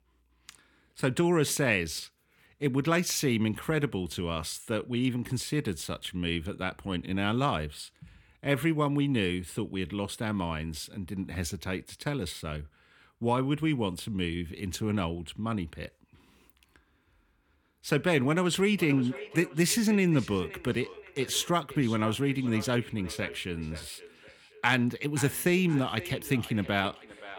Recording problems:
echo of what is said; noticeable; from 19 s on; 520 ms later, 15 dB below the speech

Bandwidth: 17.5 kHz